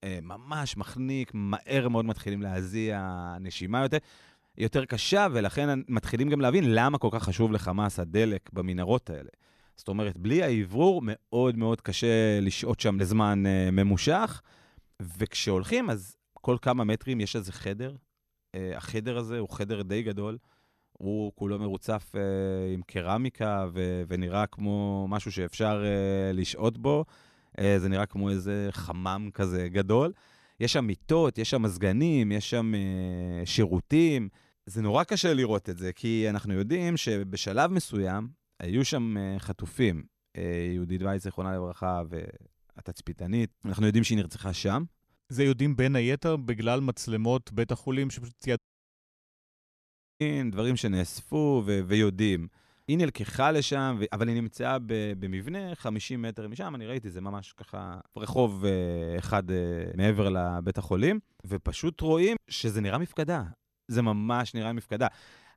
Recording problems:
audio cutting out; at 49 s for 1.5 s

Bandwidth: 13.5 kHz